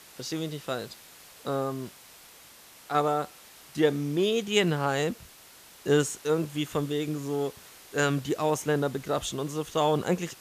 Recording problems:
hiss; faint; throughout; 20 dB below the speech

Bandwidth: 14.5 kHz